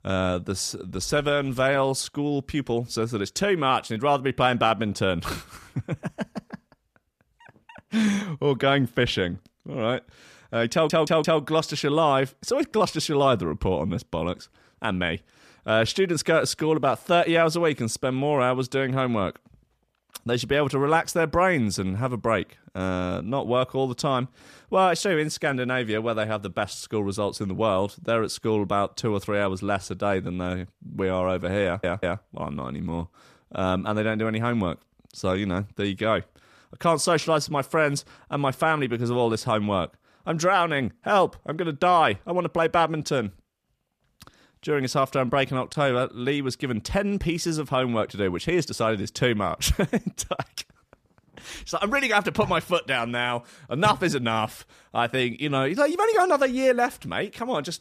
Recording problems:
audio stuttering; at 11 s and at 32 s

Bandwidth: 14.5 kHz